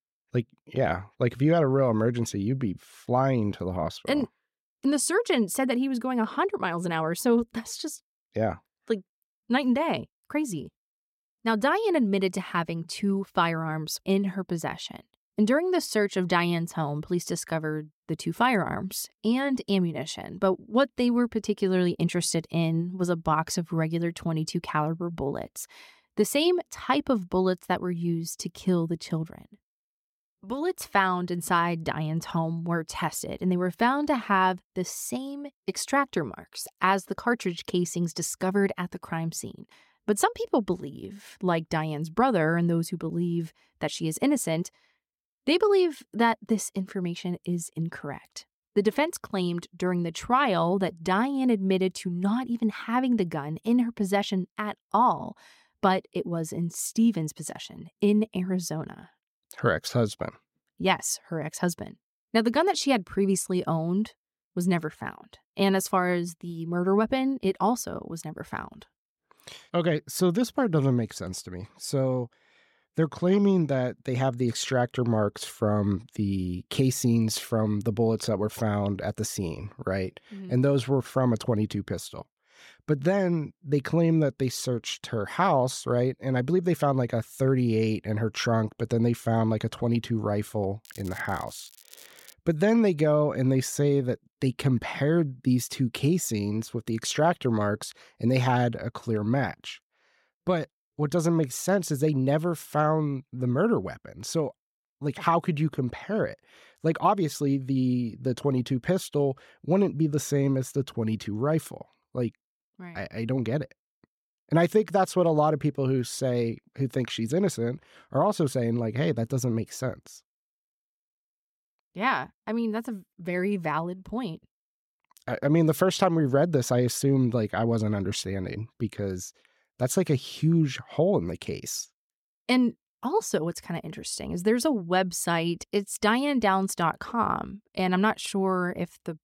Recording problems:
crackling; faint; from 1:31 to 1:32; 20 dB below the speech

